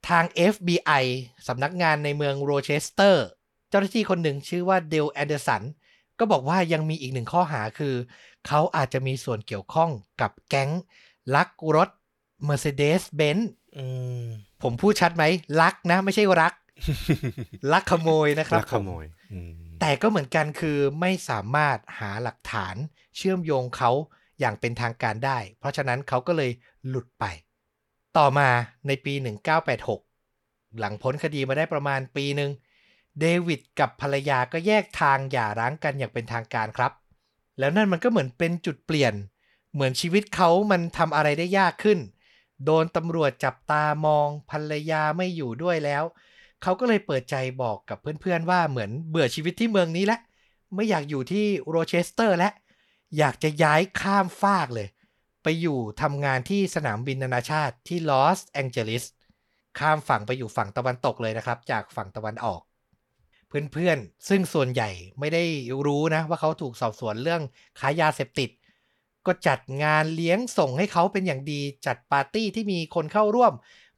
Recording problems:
none

